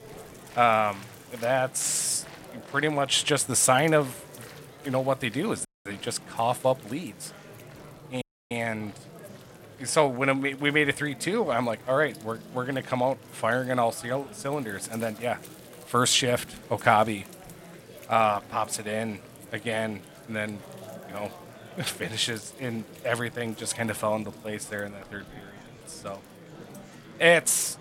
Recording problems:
murmuring crowd; noticeable; throughout; 20 dB below the speech
household noises; faint; throughout; 25 dB below the speech
audio cutting out; at 5.5 s and at 8 s

